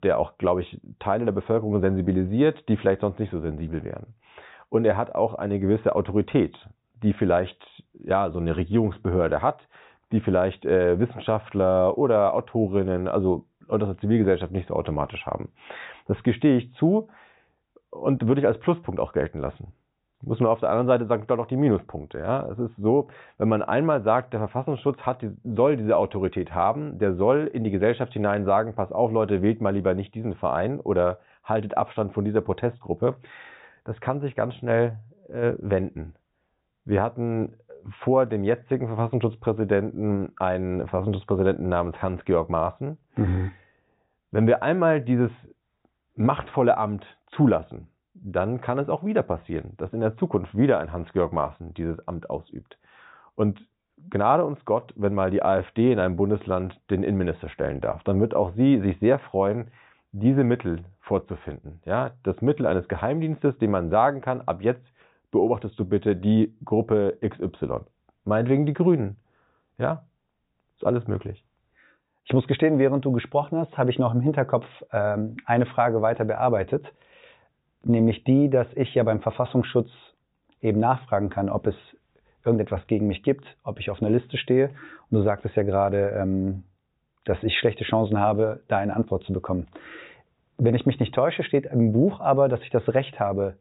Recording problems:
high frequencies cut off; severe; nothing above 4 kHz

